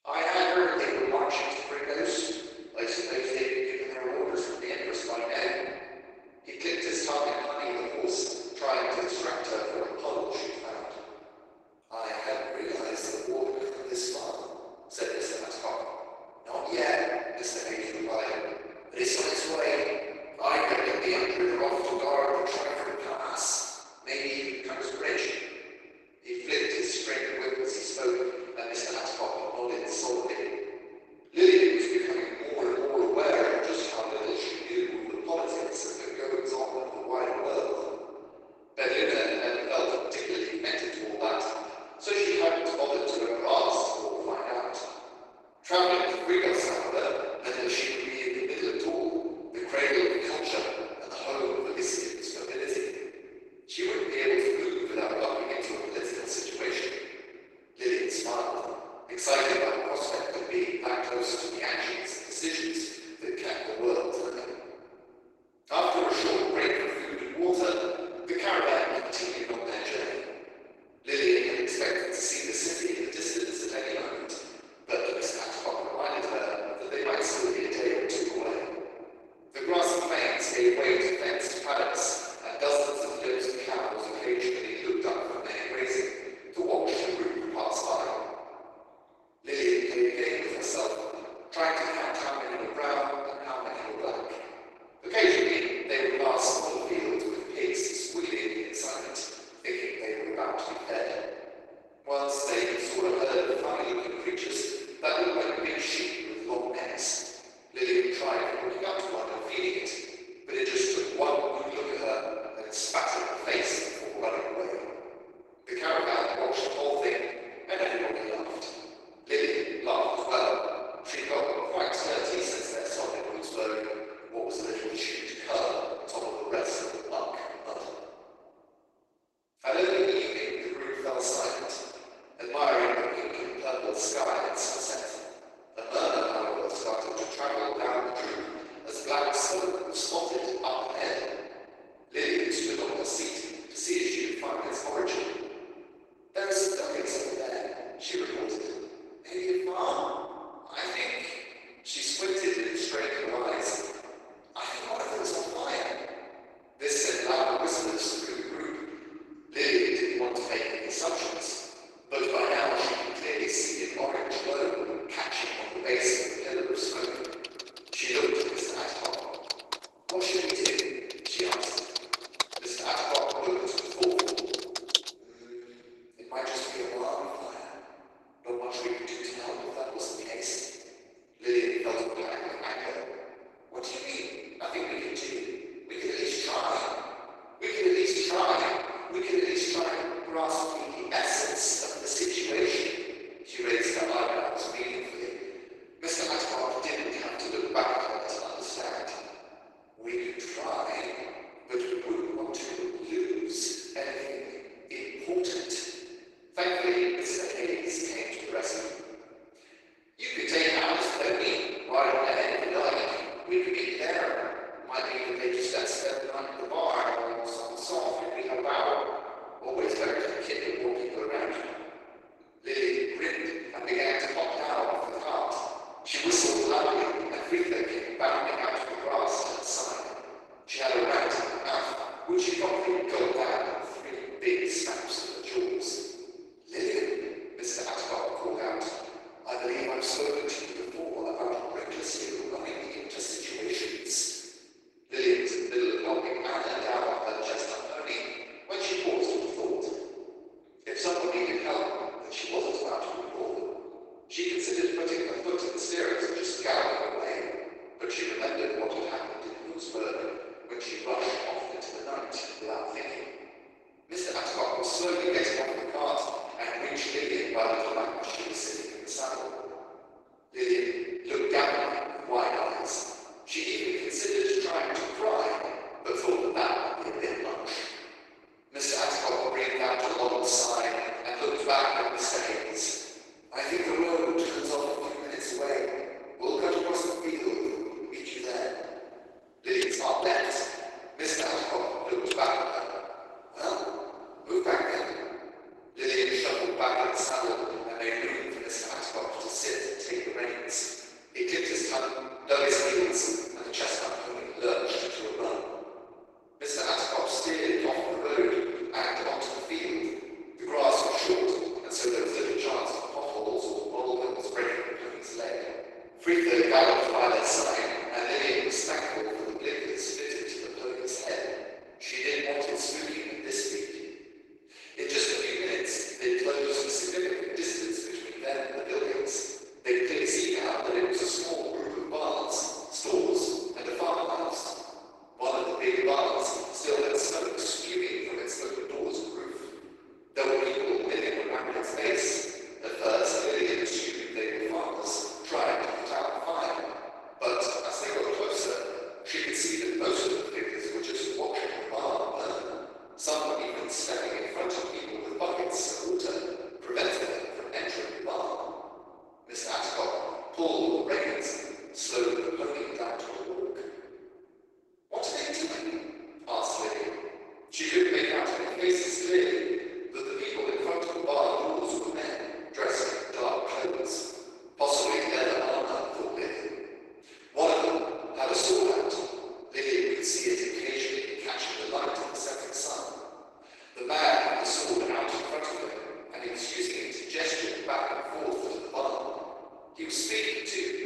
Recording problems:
room echo; strong; dies away in 1.9 s
off-mic speech; far
garbled, watery; badly; nothing above 12 kHz
thin; very; fading below 350 Hz
uneven, jittery; strongly; from 25 s to 5:54
keyboard typing; loud; from 2:47 to 2:55; peak 3 dB above the speech
keyboard typing; noticeable; from 4:50 to 4:52; peak 7 dB below the speech

